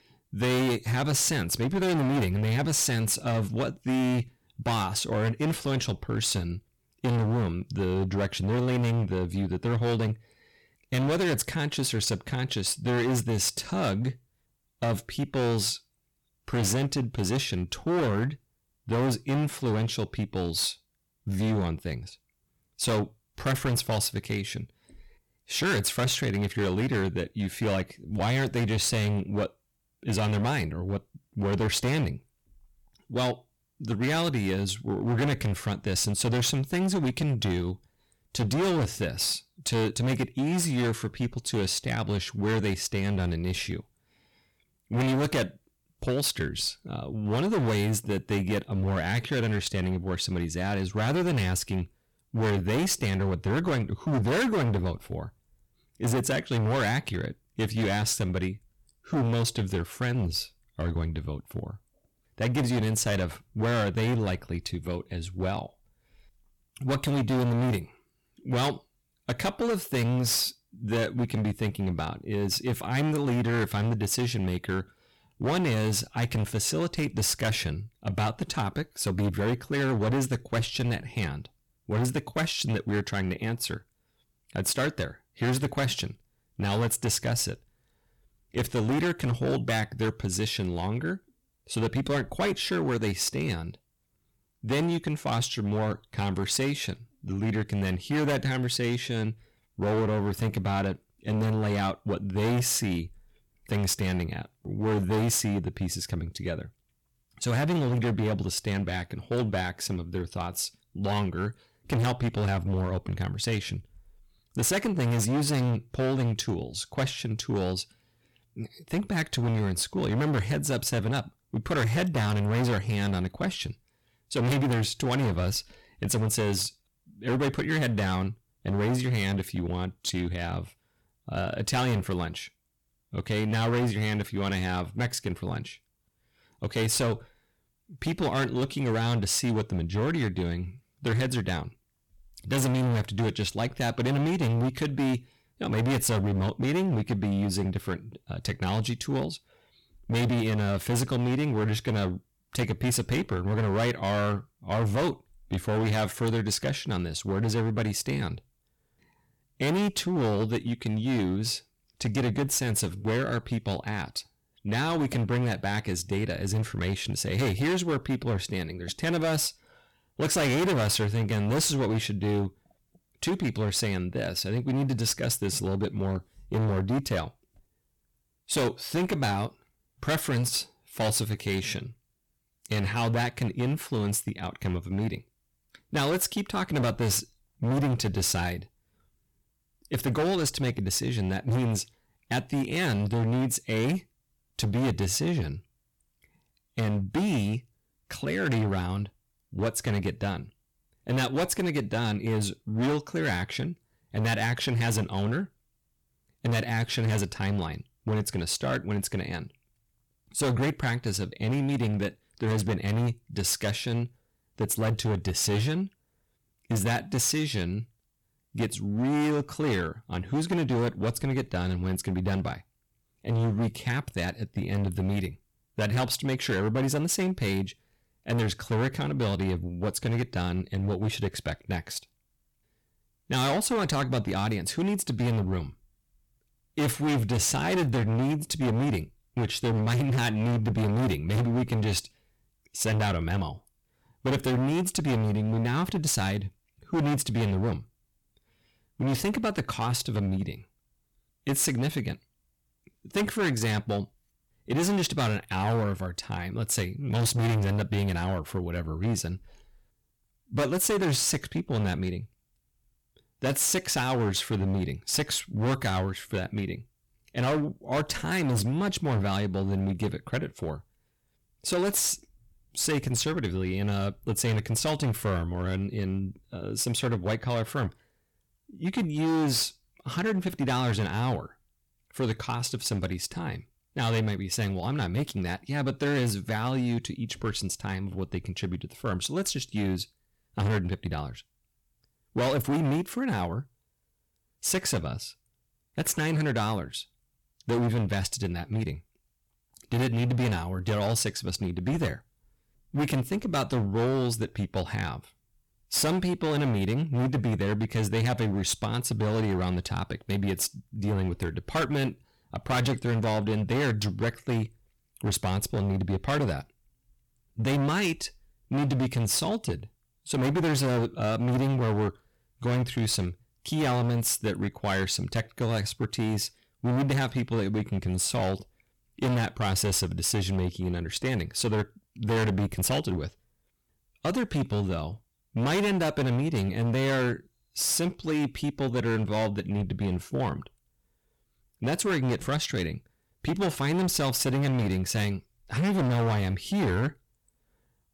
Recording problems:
distortion; heavy; 17% of the sound clipped

